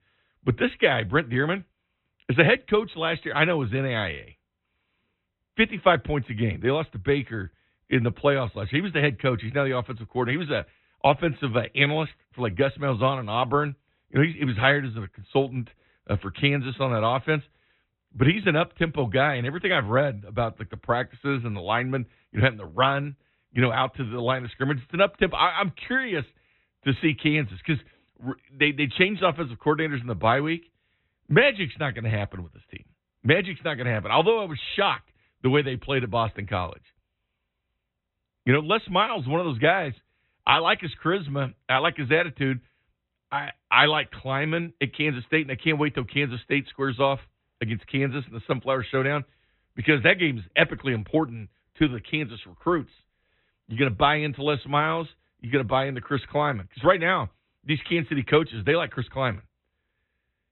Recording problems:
high frequencies cut off; severe; nothing above 4 kHz

